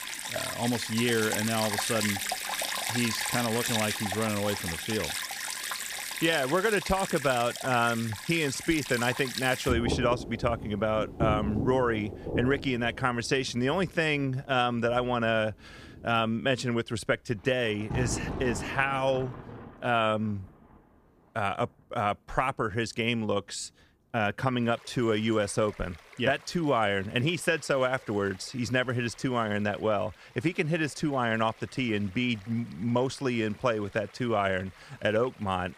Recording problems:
rain or running water; loud; throughout; 4 dB below the speech

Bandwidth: 15 kHz